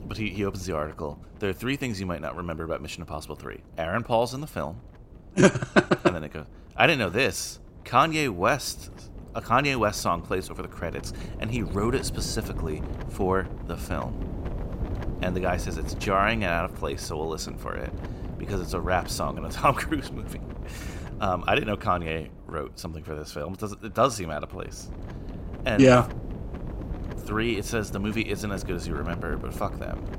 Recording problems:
wind noise on the microphone; occasional gusts; 20 dB below the speech

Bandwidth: 16 kHz